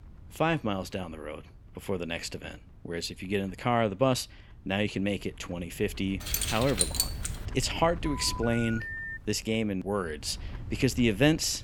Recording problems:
wind noise on the microphone; occasional gusts; 25 dB below the speech
jangling keys; loud; from 6.5 to 7.5 s; peak 3 dB above the speech
phone ringing; noticeable; from 8 to 9 s; peak 6 dB below the speech

